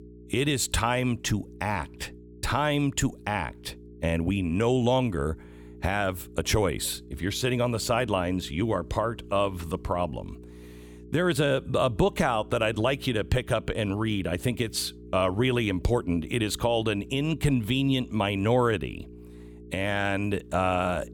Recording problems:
electrical hum; faint; throughout; 60 Hz, 25 dB below the speech

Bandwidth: 18 kHz